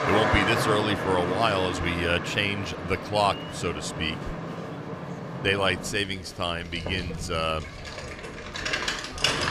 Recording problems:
traffic noise; loud; throughout; 4 dB below the speech
chatter from many people; noticeable; throughout; 20 dB below the speech

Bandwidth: 15 kHz